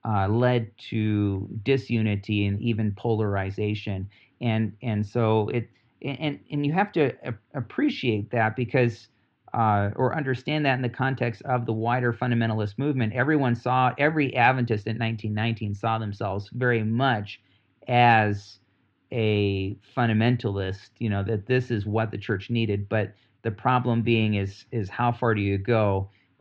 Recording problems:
muffled; slightly; fading above 3.5 kHz

